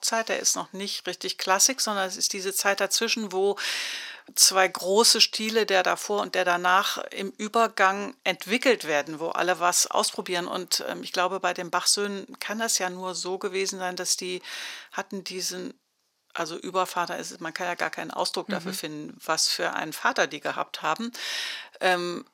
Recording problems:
thin; somewhat; fading below 500 Hz

